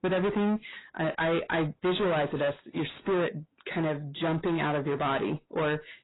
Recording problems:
distortion; heavy; 6 dB below the speech
garbled, watery; badly; nothing above 4 kHz

